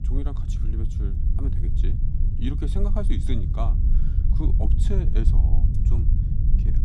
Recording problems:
low rumble; loud; throughout; 3 dB below the speech

